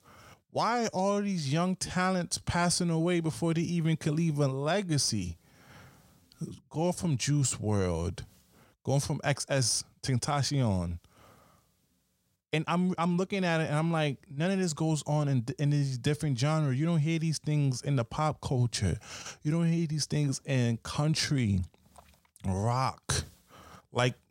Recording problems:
uneven, jittery; strongly; from 1 to 23 s

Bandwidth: 16 kHz